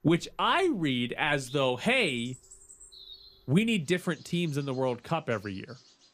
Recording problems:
animal sounds; faint; throughout; 25 dB below the speech

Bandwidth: 15 kHz